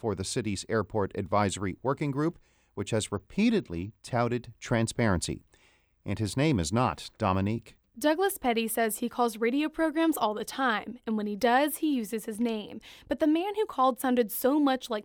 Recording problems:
none

